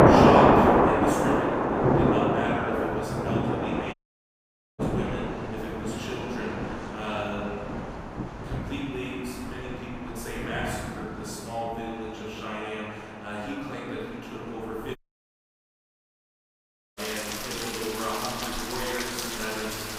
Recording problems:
room echo; strong; dies away in 2 s
off-mic speech; far
rain or running water; very loud; throughout; 7 dB above the speech
audio cutting out; at 4 s for 1 s and at 15 s for 2 s

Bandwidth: 15.5 kHz